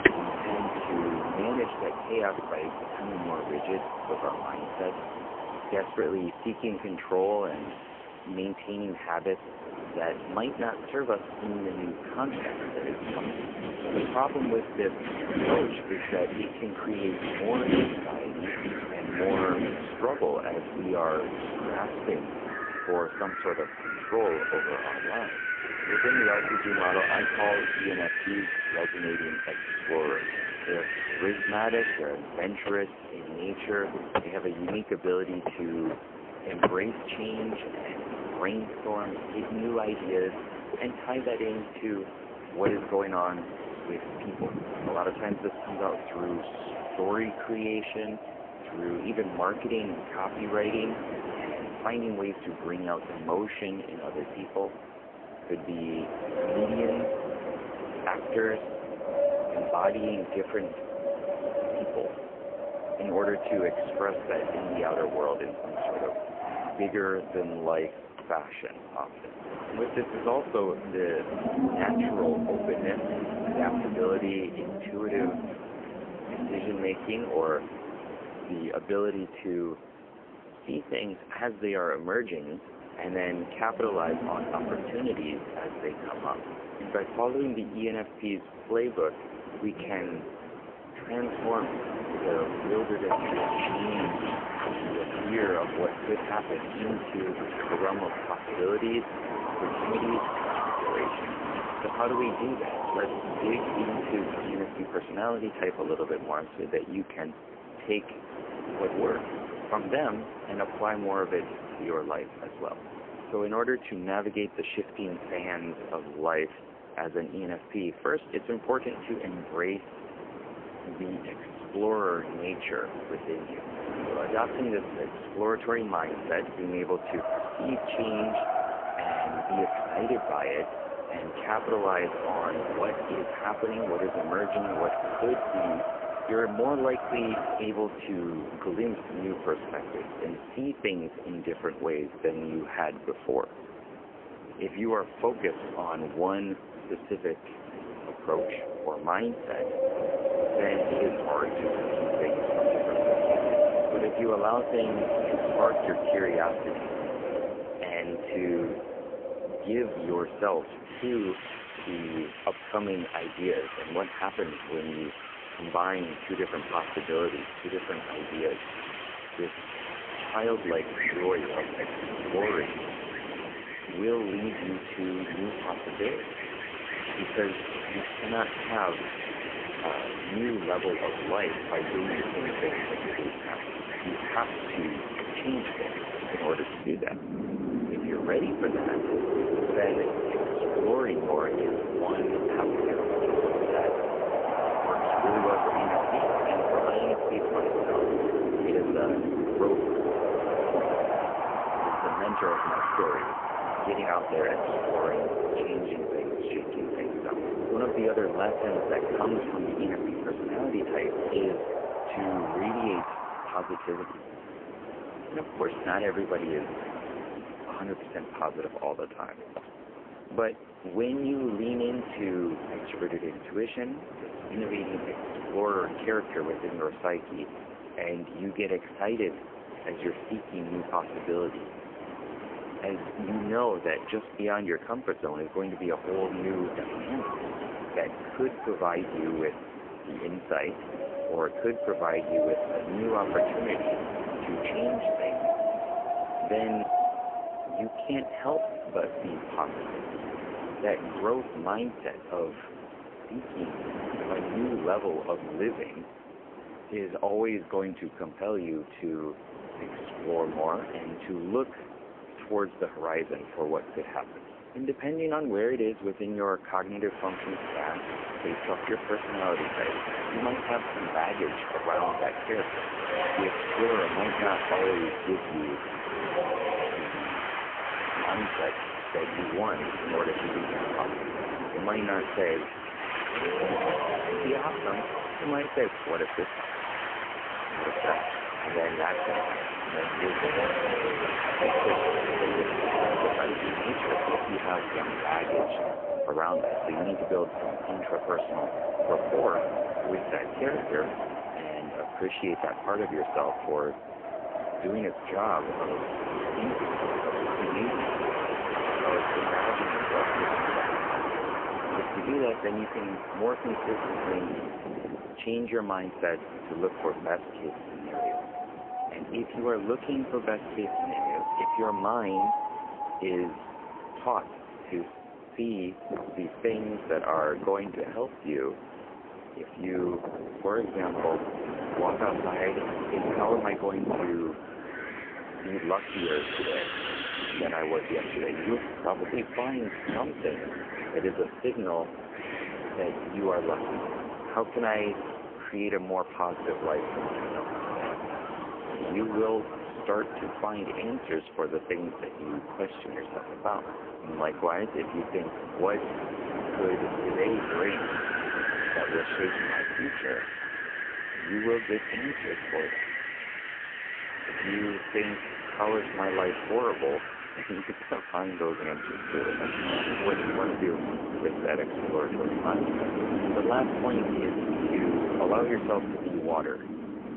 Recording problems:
phone-call audio; poor line; nothing above 3 kHz
wind in the background; loud; throughout; as loud as the speech

